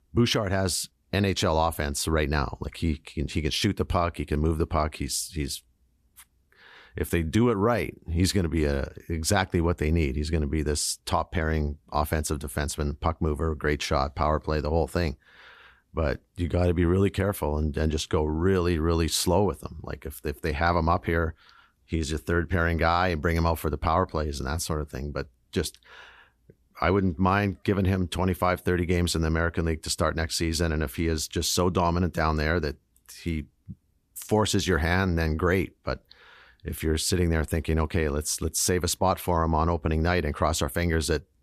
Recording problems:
none

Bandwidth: 14.5 kHz